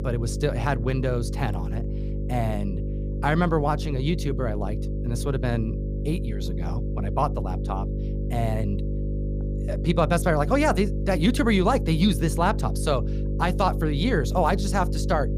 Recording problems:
electrical hum; noticeable; throughout; 50 Hz, 10 dB below the speech

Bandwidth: 15 kHz